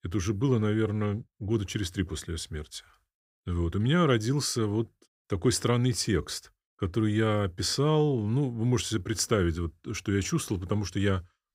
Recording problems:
none

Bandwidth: 15.5 kHz